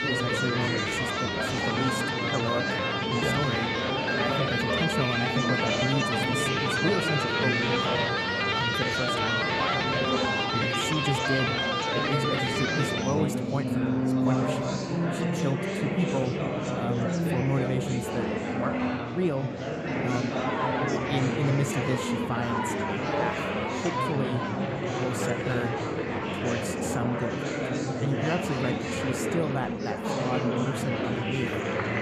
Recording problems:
background music; very loud; throughout; 4 dB above the speech
chatter from many people; very loud; throughout; 2 dB above the speech

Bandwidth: 14.5 kHz